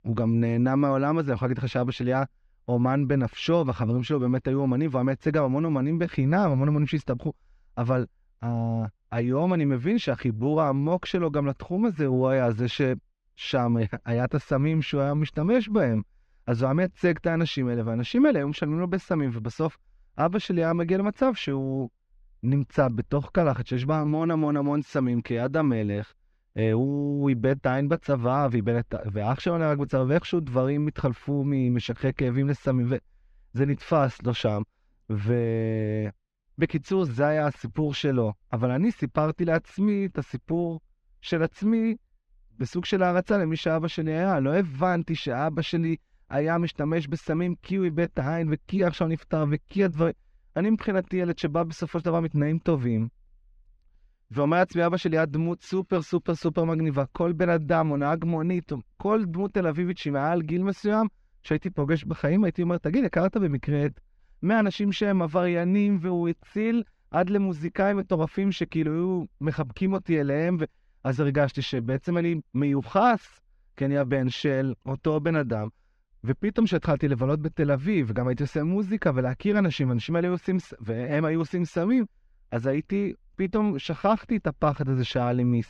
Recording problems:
muffled; very slightly; fading above 3 kHz

